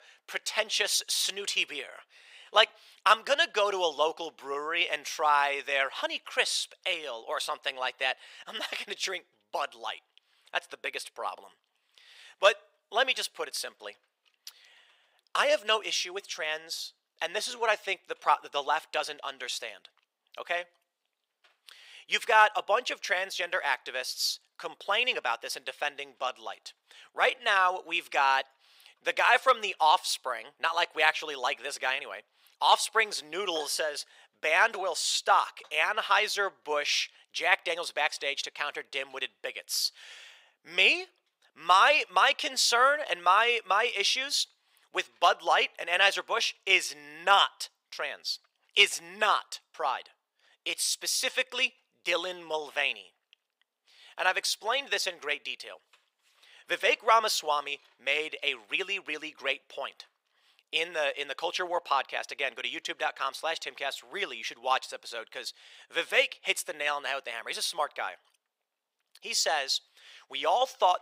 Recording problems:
thin; very; fading below 550 Hz

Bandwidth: 15.5 kHz